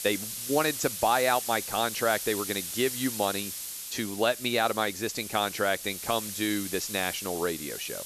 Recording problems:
high frequencies cut off; slight; nothing above 8 kHz
hiss; loud; throughout; 6 dB below the speech

